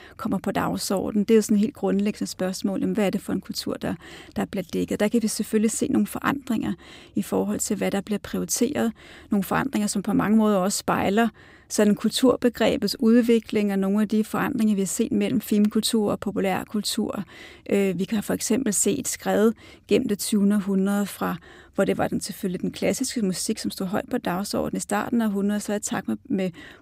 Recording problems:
none

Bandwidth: 15.5 kHz